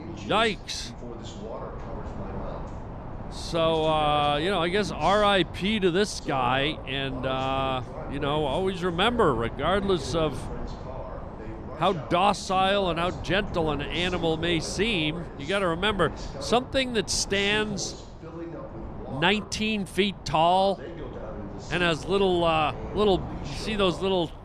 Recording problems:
voice in the background; noticeable; throughout; 15 dB below the speech
wind noise on the microphone; occasional gusts; 20 dB below the speech

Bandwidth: 14.5 kHz